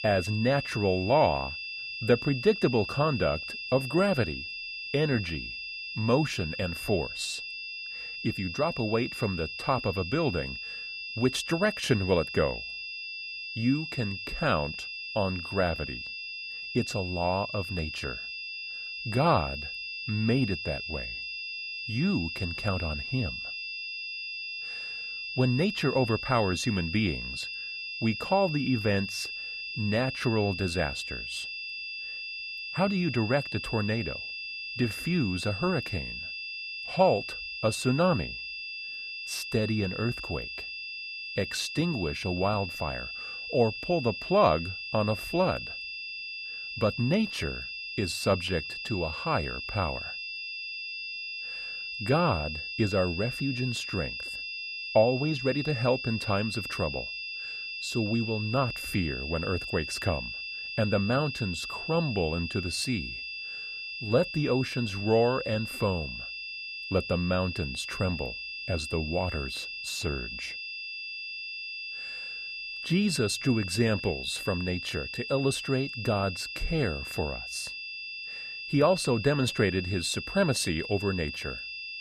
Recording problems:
high-pitched whine; loud; throughout; 2.5 kHz, 6 dB below the speech

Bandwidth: 14.5 kHz